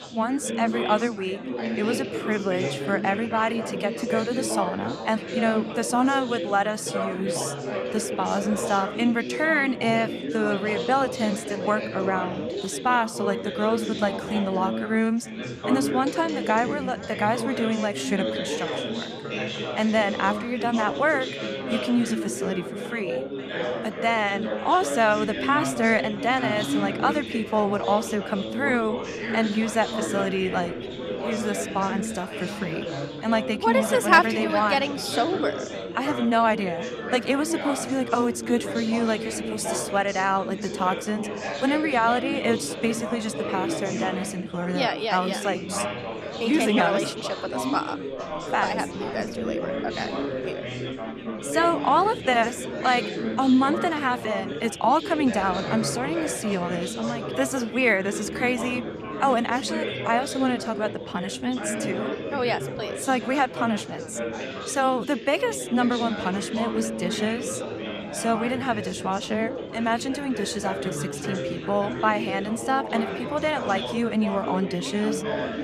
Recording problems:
chatter from many people; loud; throughout; 5 dB below the speech

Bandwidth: 14.5 kHz